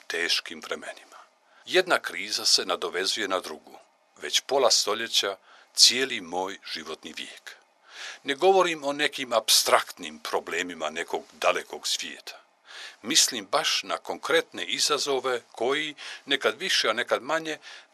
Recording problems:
thin; very; fading below 700 Hz

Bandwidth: 13.5 kHz